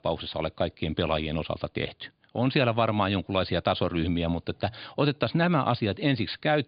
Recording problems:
high frequencies cut off; severe; nothing above 5 kHz

